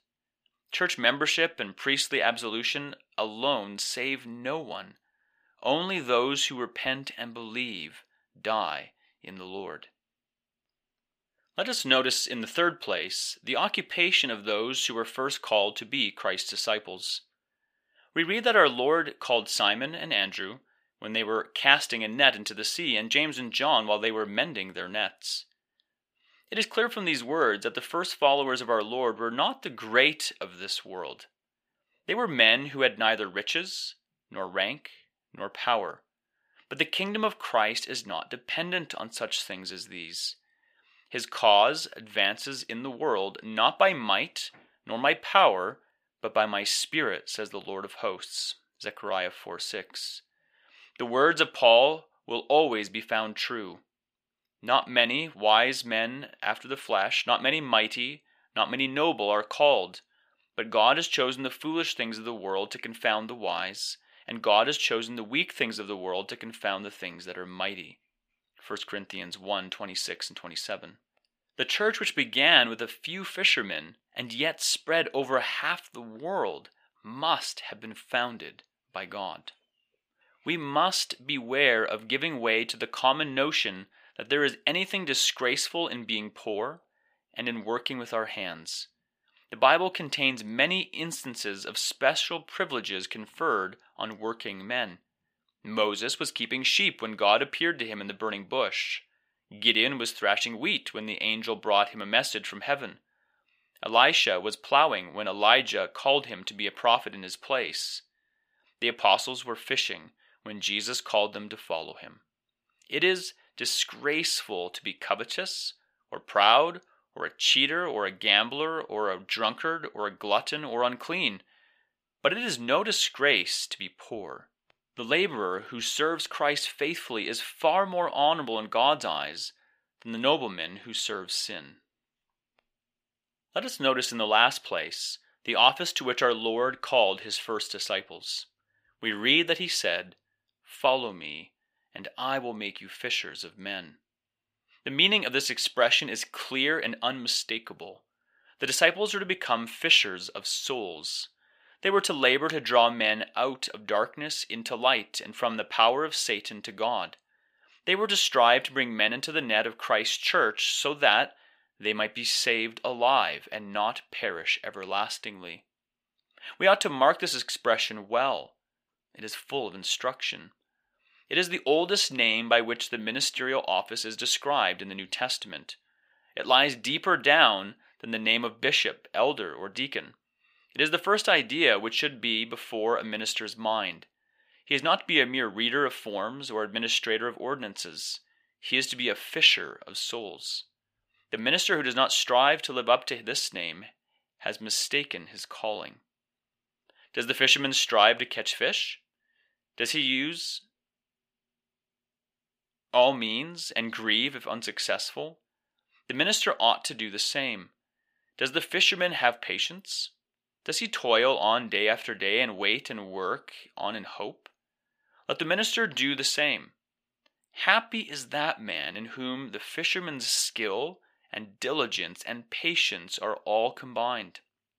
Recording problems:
thin; somewhat; fading below 1 kHz

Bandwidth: 15 kHz